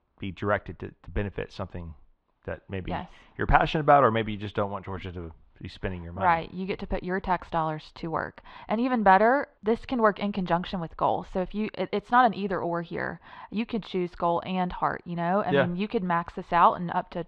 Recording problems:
muffled; slightly; fading above 3.5 kHz

